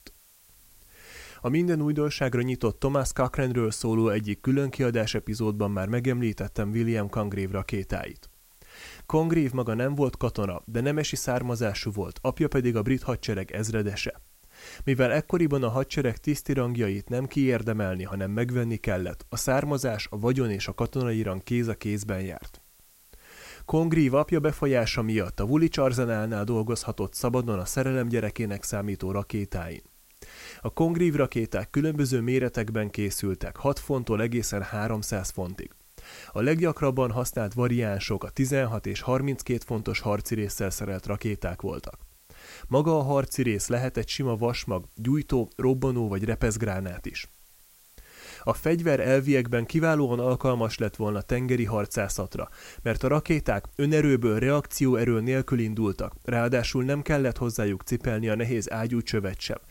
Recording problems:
hiss; faint; throughout; 30 dB below the speech

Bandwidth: 16 kHz